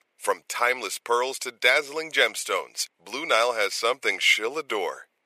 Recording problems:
thin; very; fading below 450 Hz

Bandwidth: 14.5 kHz